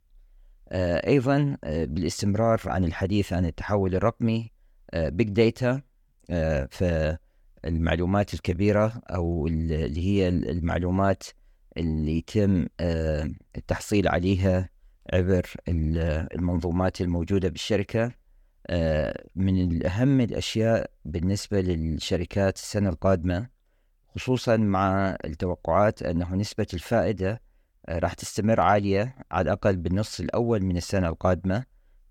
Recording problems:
none

